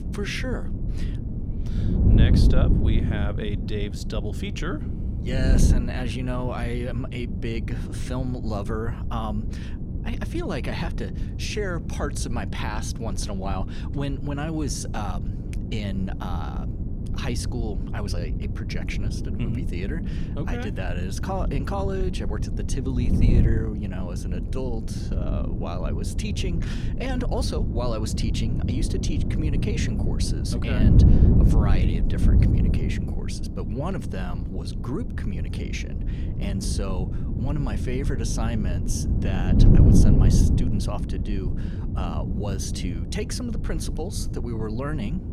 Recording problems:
wind noise on the microphone; heavy; 3 dB below the speech

